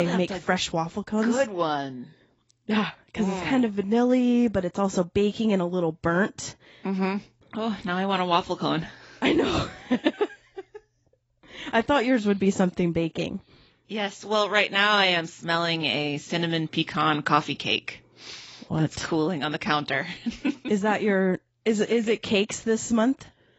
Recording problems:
garbled, watery; badly; nothing above 7.5 kHz
abrupt cut into speech; at the start

